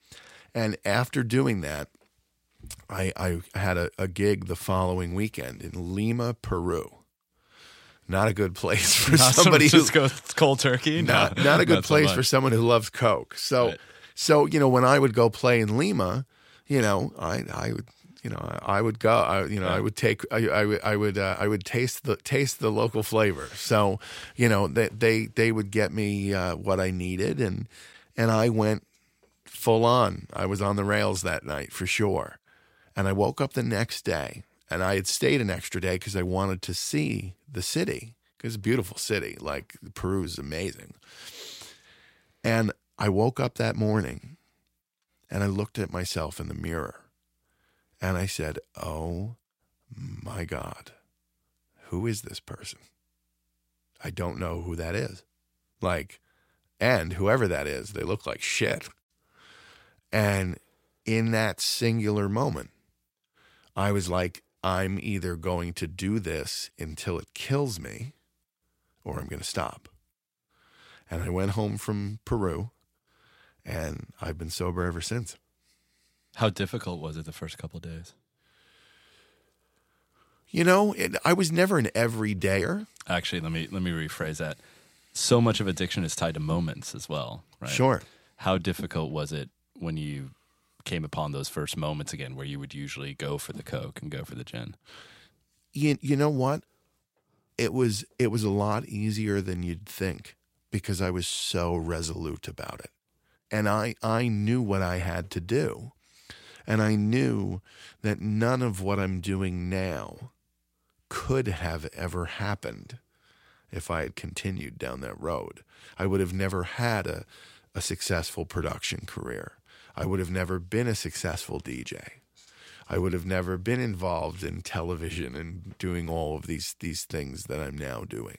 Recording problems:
none

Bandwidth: 16 kHz